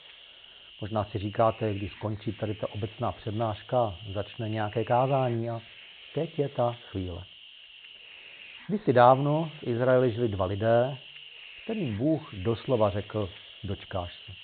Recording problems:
high frequencies cut off; severe; nothing above 4 kHz
hiss; noticeable; throughout; 15 dB below the speech

